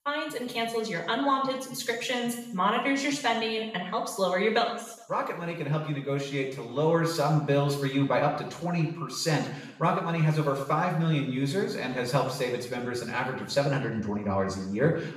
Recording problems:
off-mic speech; far
room echo; noticeable; dies away in 0.7 s

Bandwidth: 14.5 kHz